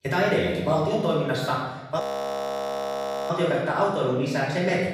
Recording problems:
off-mic speech; far
room echo; noticeable; dies away in 1.1 s
audio freezing; at 2 s for 1.5 s

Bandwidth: 15.5 kHz